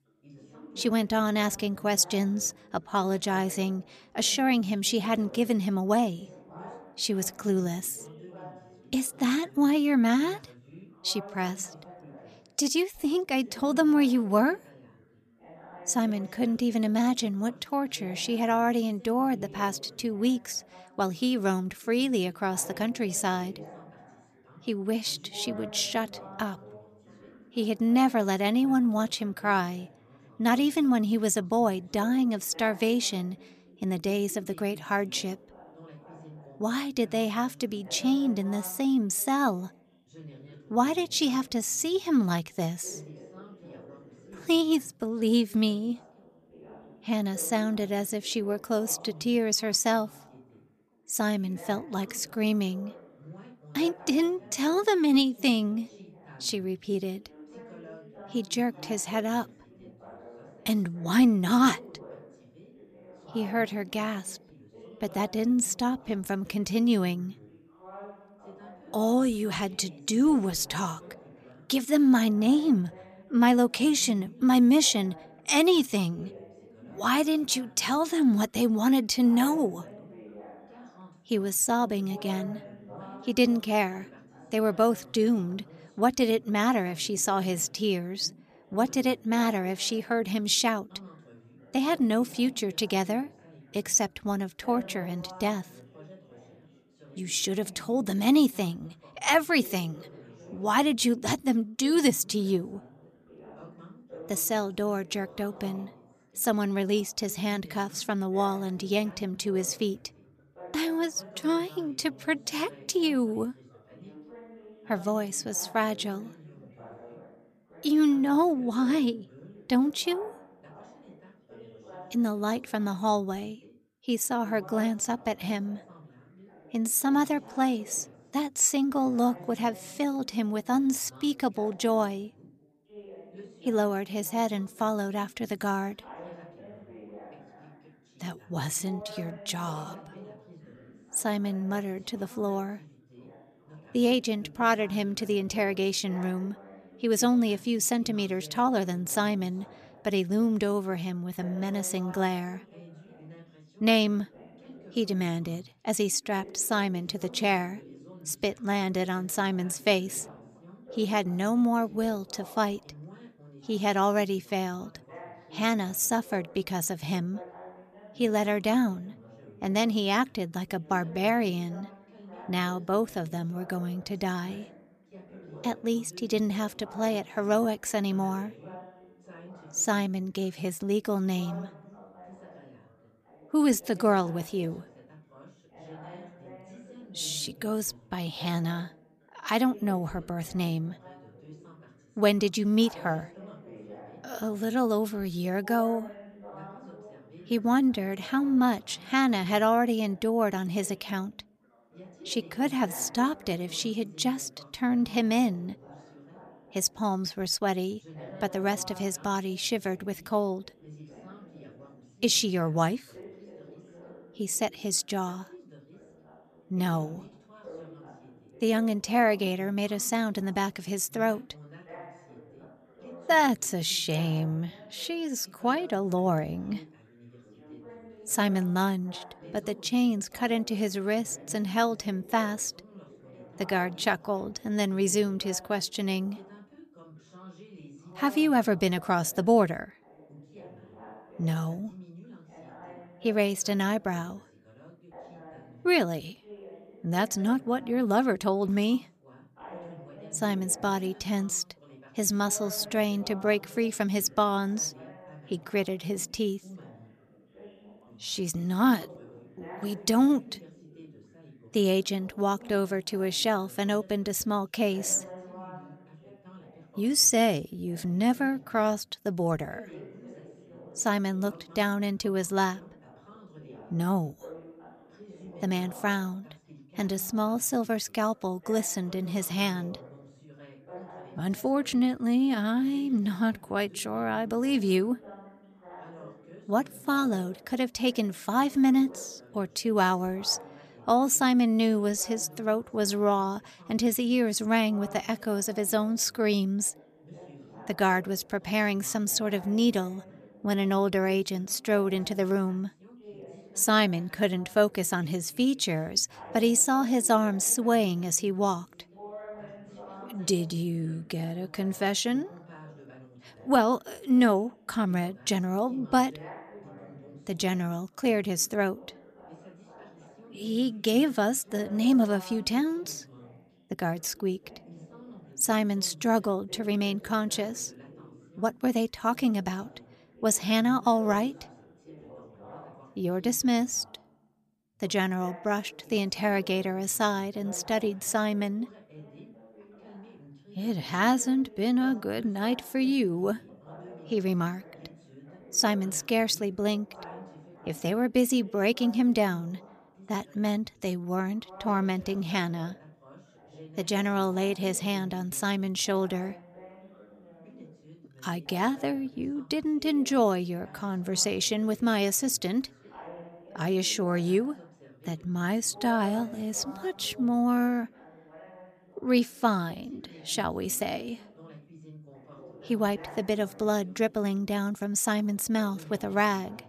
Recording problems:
background chatter; faint; throughout; 3 voices, 20 dB below the speech

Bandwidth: 14.5 kHz